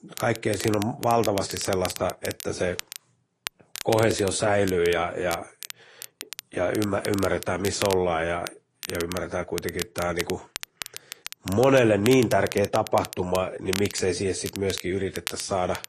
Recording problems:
garbled, watery; slightly; nothing above 10.5 kHz
crackle, like an old record; noticeable; 10 dB below the speech

